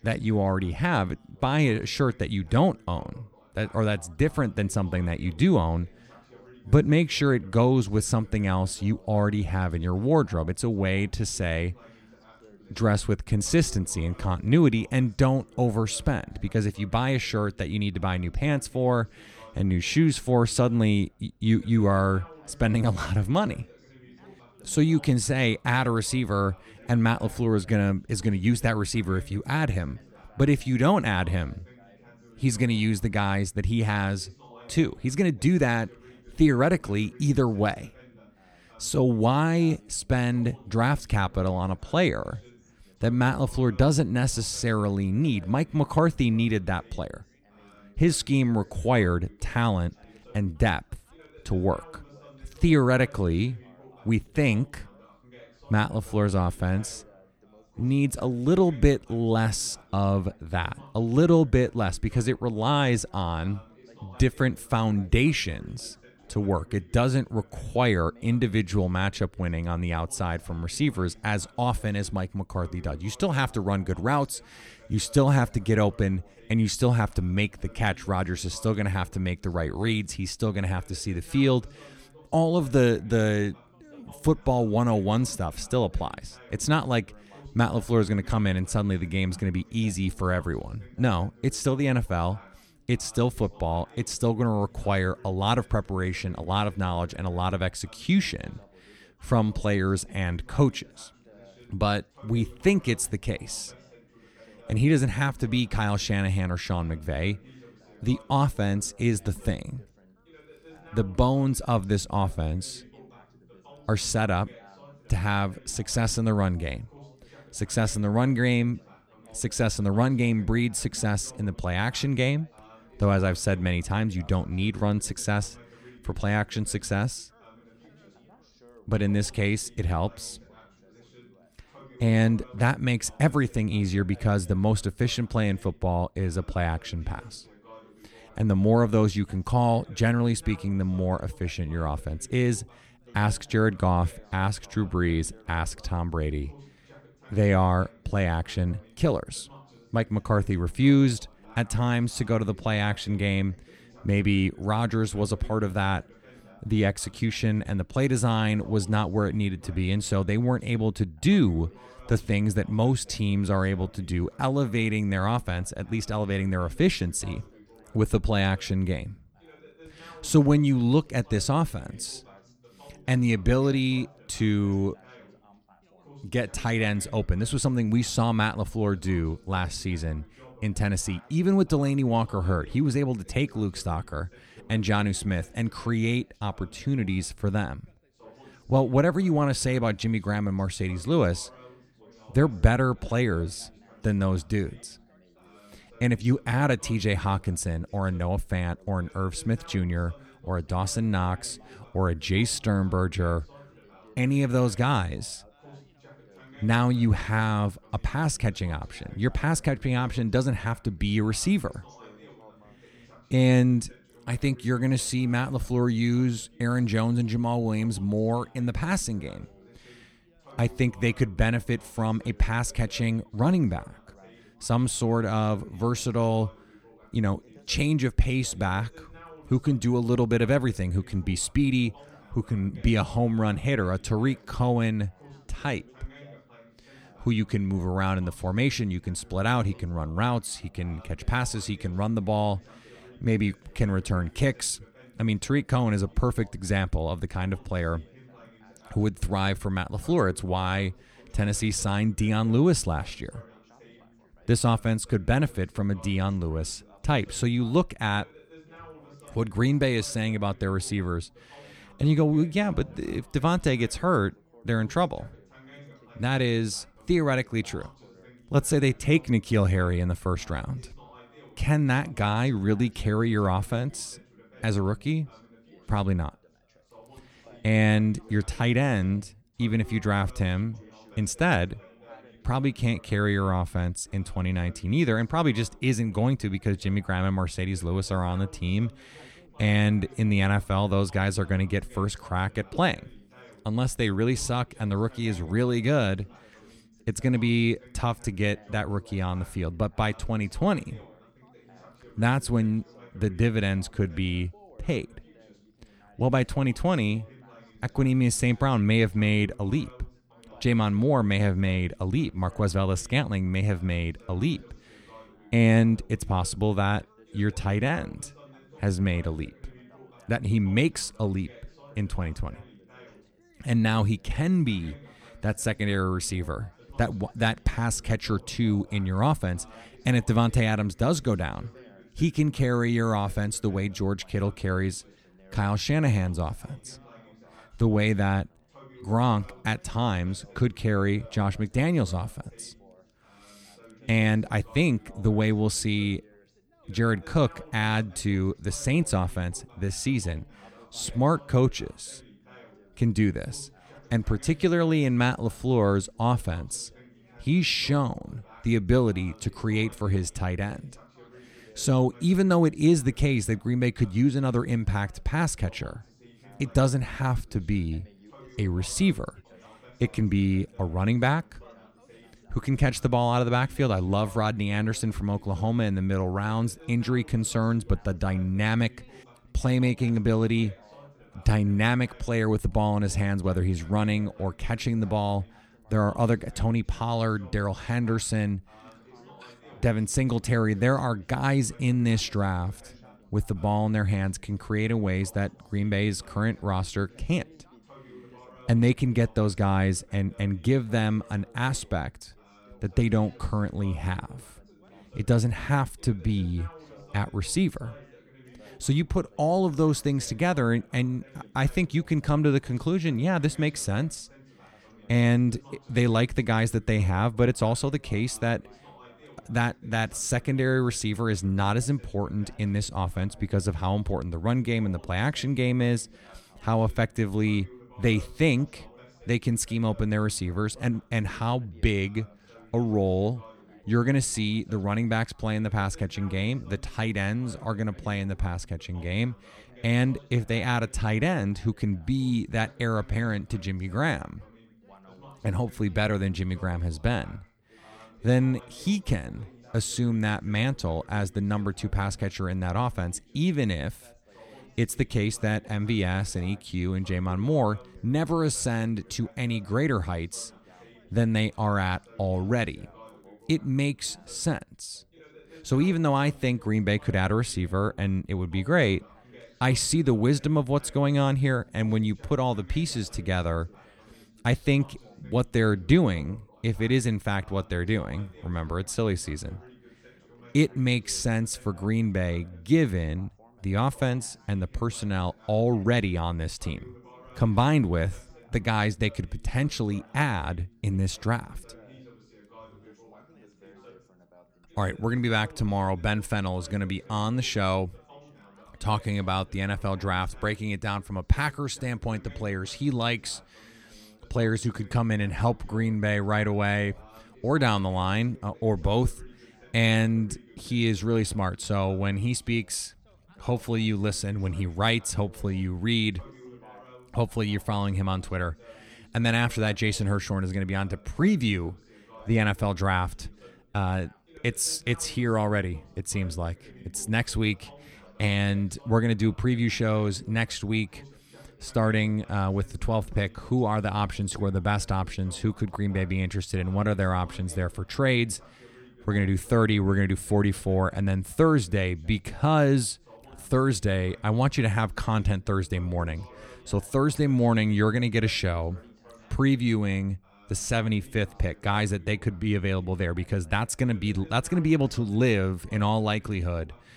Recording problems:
background chatter; faint; throughout; 3 voices, 25 dB below the speech

